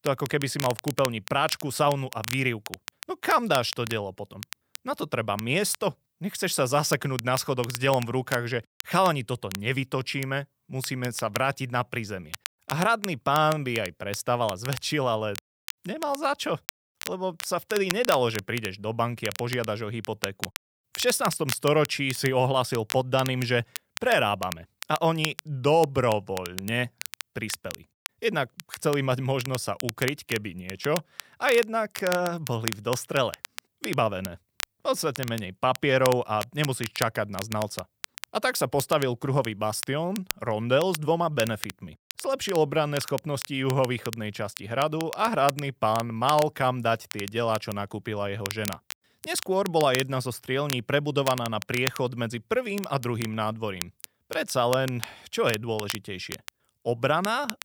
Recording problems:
crackle, like an old record; noticeable; 10 dB below the speech

